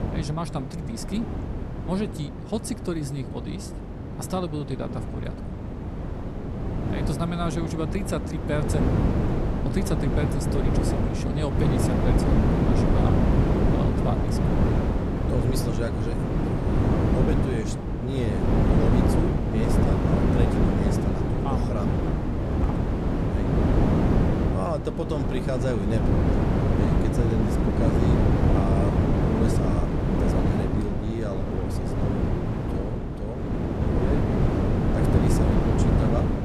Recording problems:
wind noise on the microphone; heavy; 4 dB above the speech

